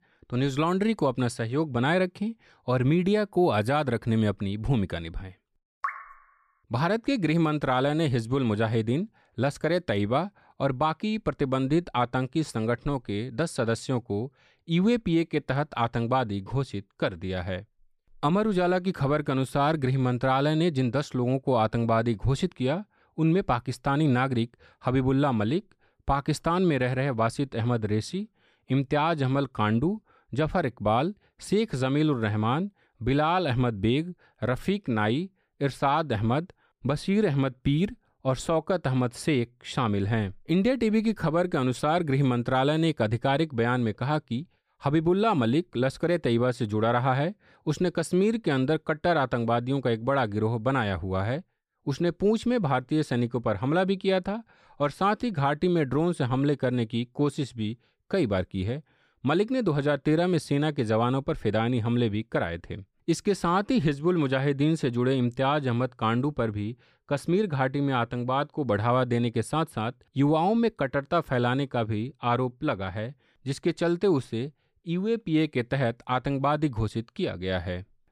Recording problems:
none

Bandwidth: 14.5 kHz